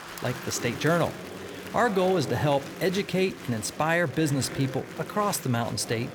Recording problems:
murmuring crowd; noticeable; throughout; 10 dB below the speech

